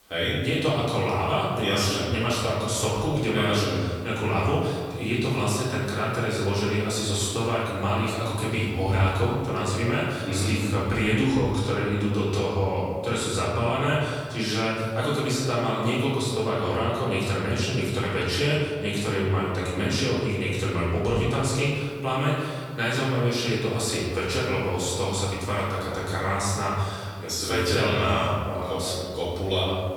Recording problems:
off-mic speech; far
room echo; noticeable; dies away in 1.7 s
hiss; very faint; throughout; 30 dB below the speech

